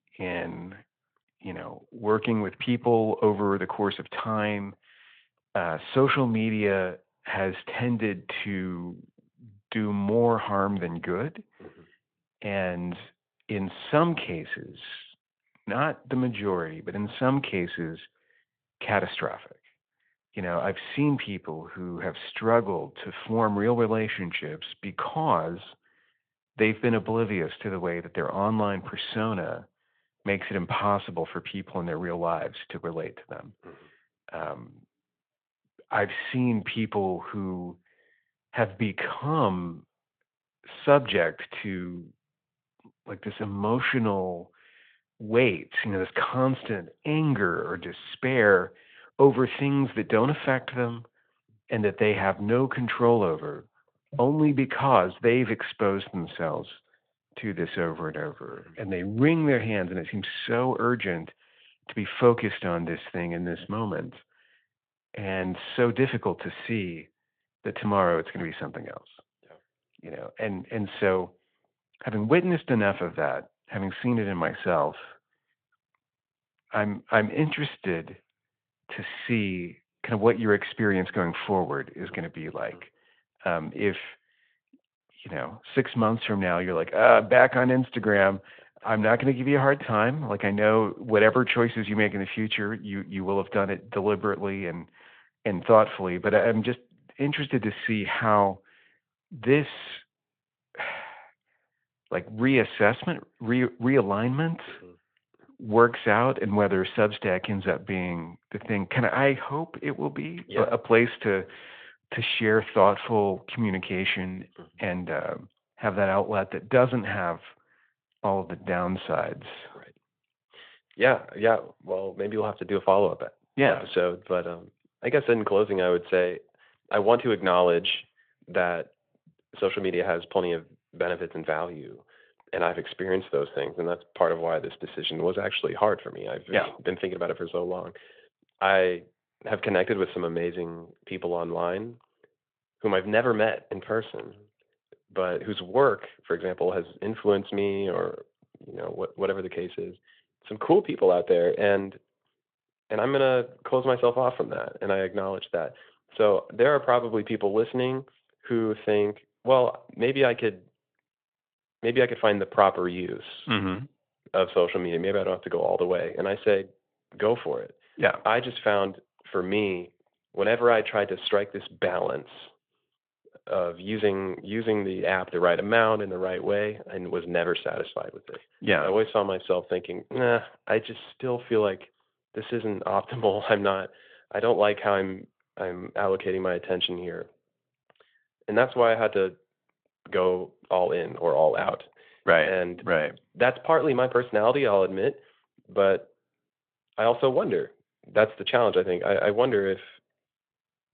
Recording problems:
phone-call audio

